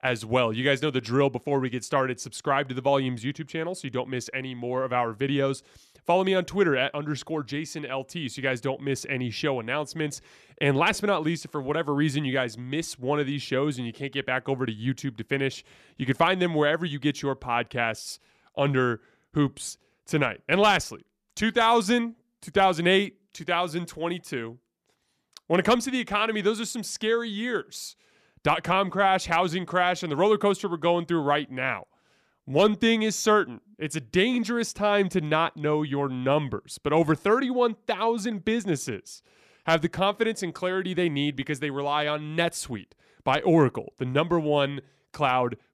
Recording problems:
none

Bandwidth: 14.5 kHz